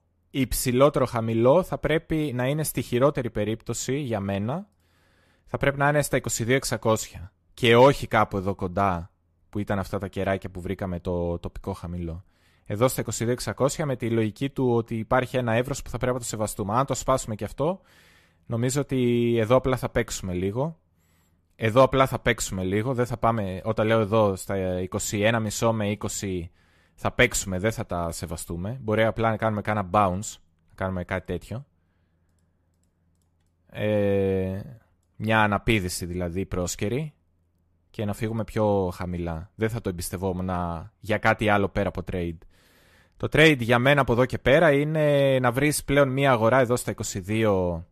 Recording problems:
none

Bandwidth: 14 kHz